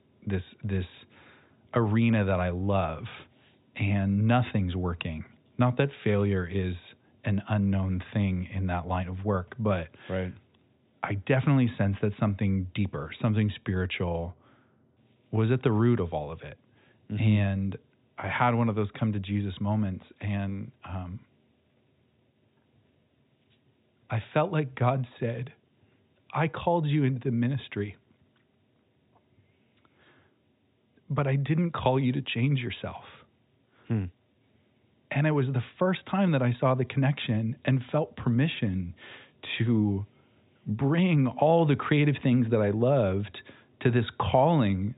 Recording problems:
high frequencies cut off; severe; nothing above 4 kHz

